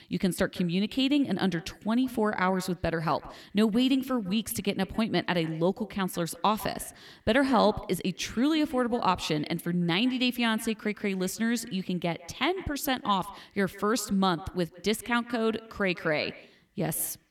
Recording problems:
echo of what is said; faint; throughout; 150 ms later, 20 dB below the speech

